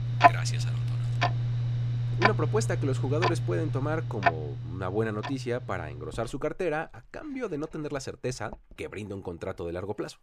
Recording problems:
household noises; very loud; throughout; 5 dB above the speech

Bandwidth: 15 kHz